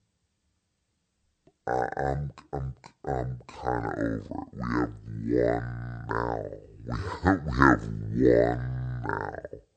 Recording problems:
wrong speed and pitch; too slow and too low; 0.6 times normal speed

